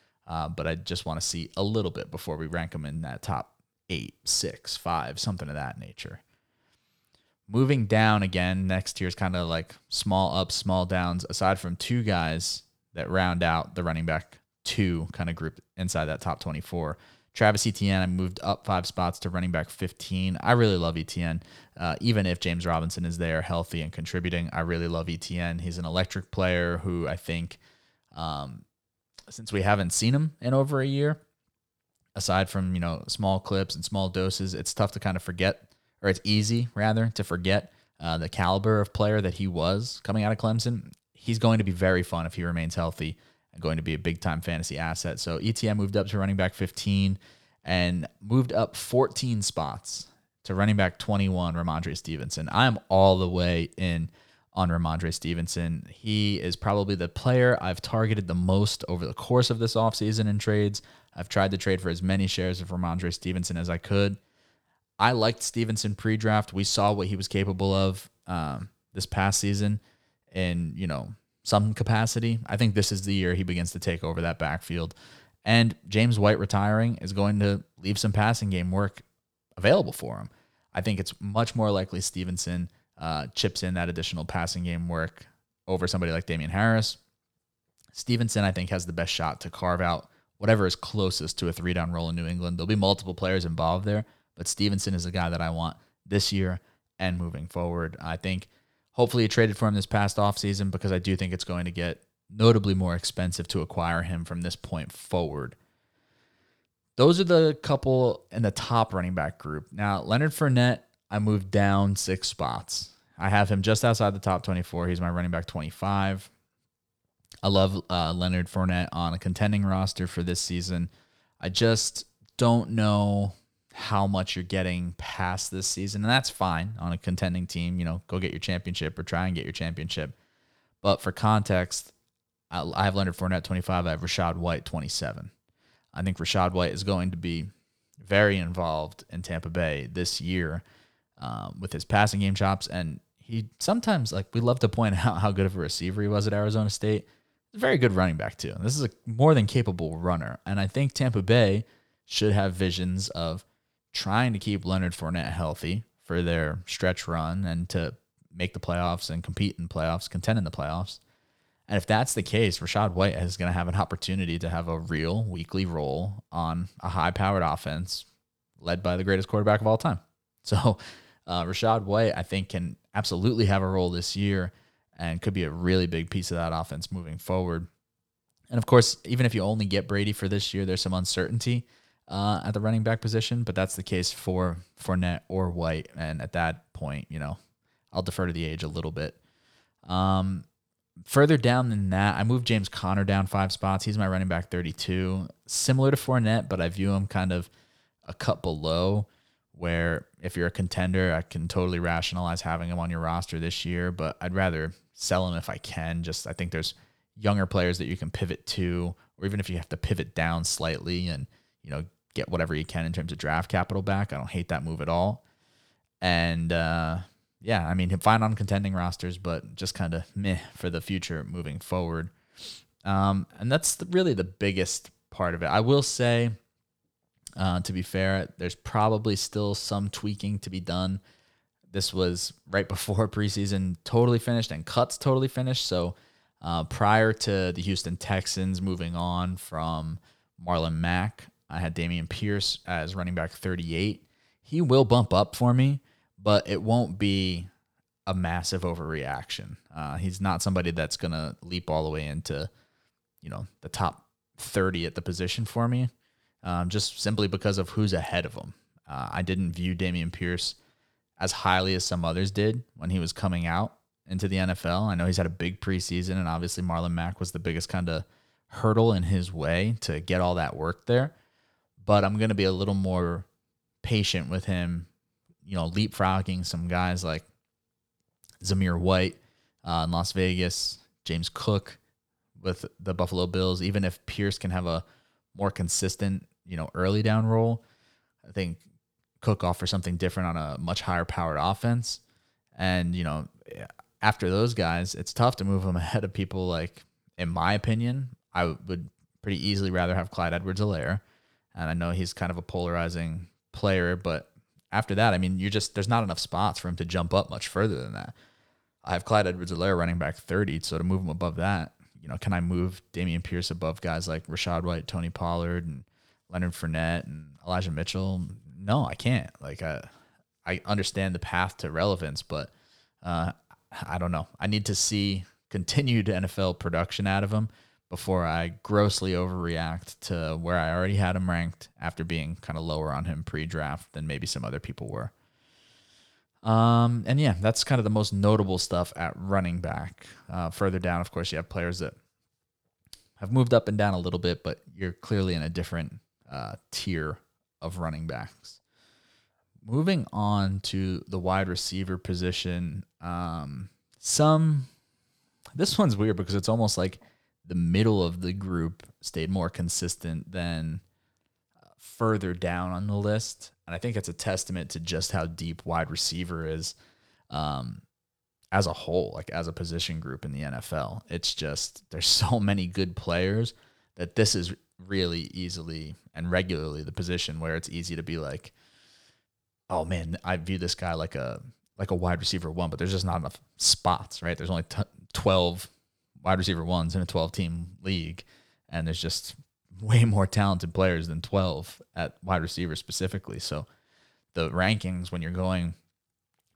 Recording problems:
none

